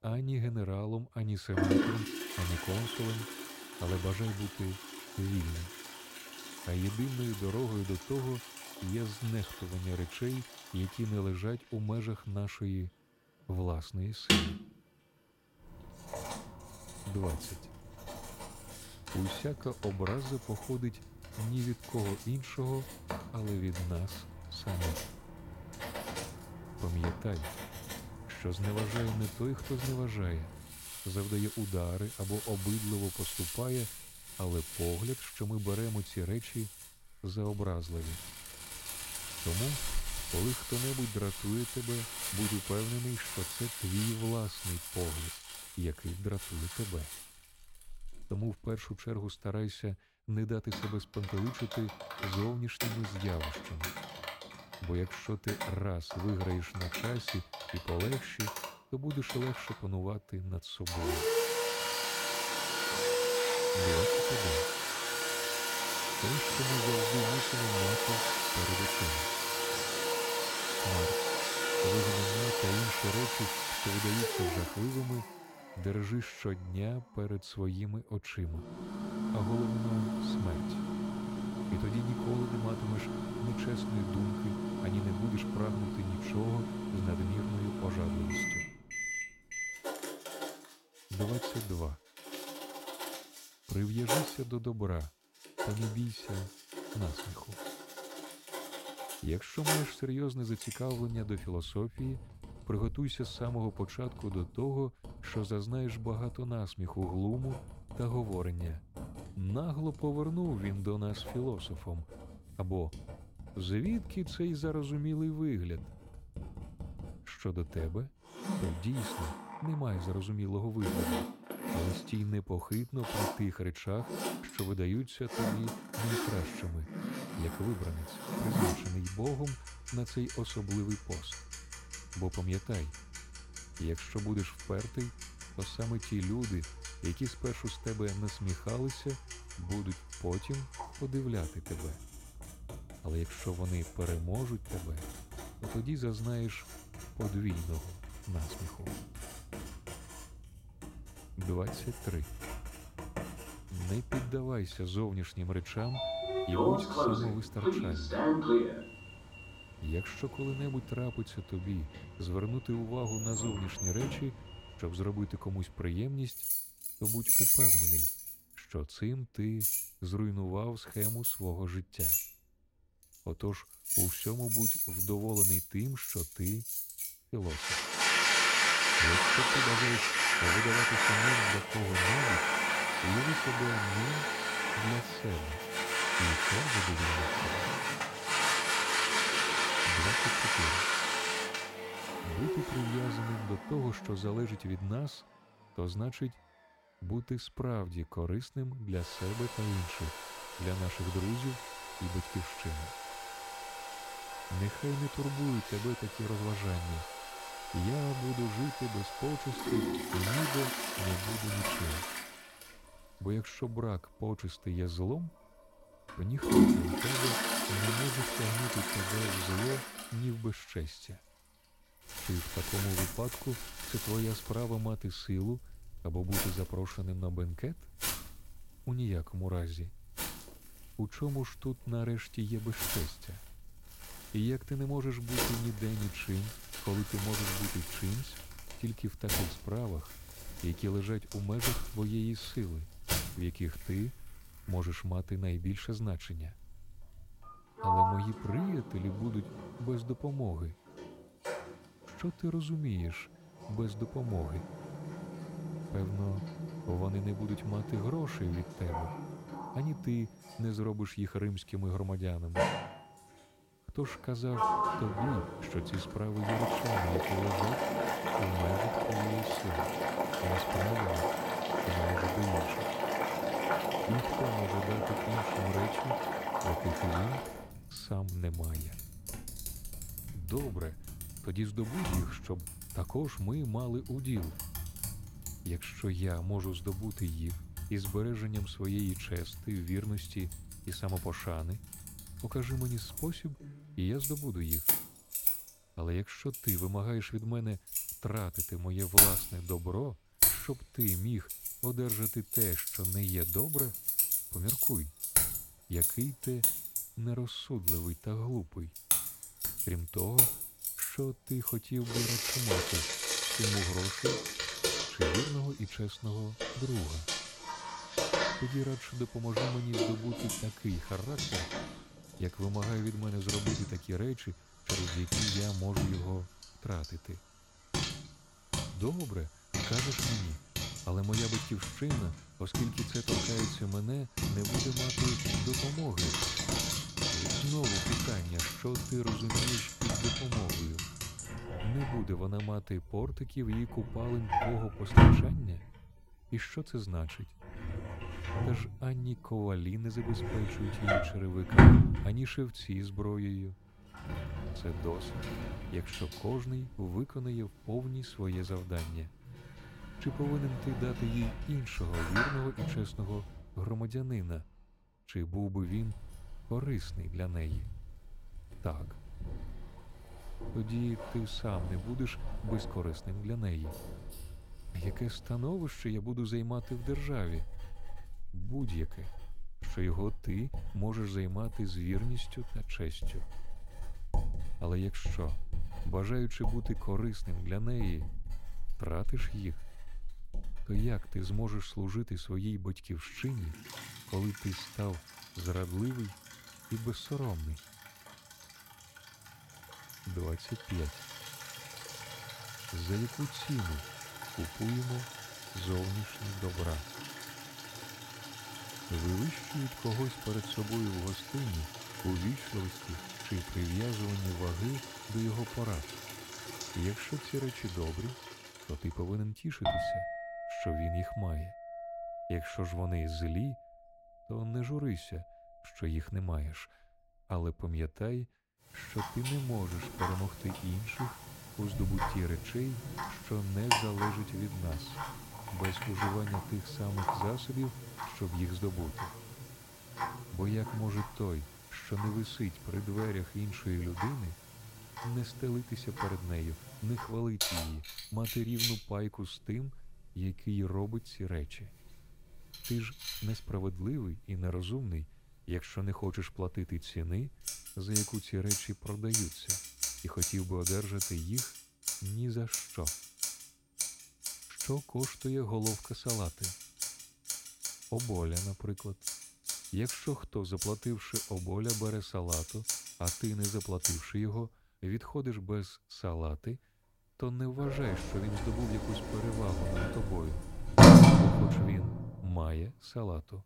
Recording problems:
household noises; very loud; throughout; 4 dB above the speech

